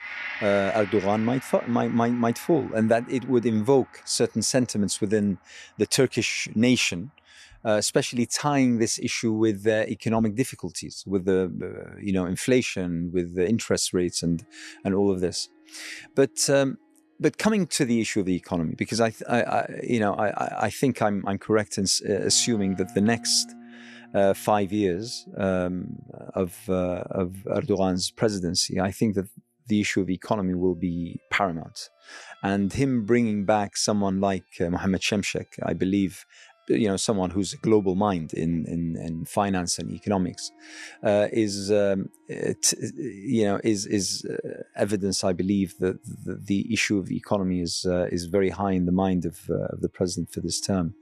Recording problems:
background music; noticeable; throughout; 20 dB below the speech

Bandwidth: 13.5 kHz